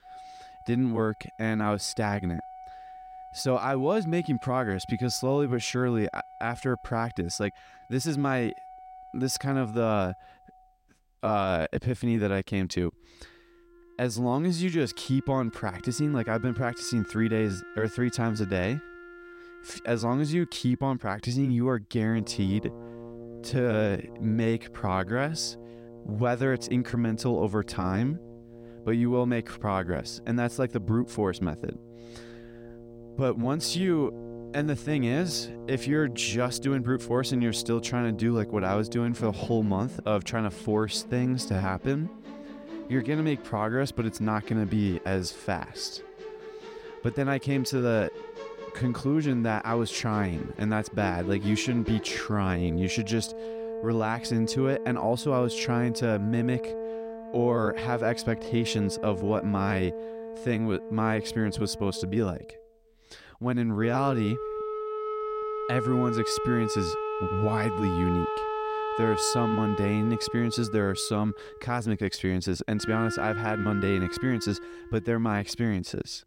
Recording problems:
background music; loud; throughout; 10 dB below the speech

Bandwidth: 16 kHz